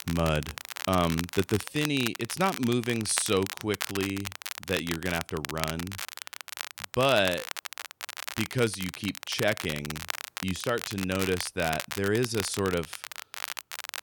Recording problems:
crackle, like an old record; loud; 7 dB below the speech

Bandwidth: 18 kHz